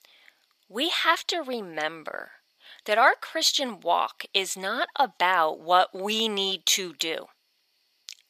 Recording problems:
thin; very; fading below 600 Hz

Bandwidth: 14.5 kHz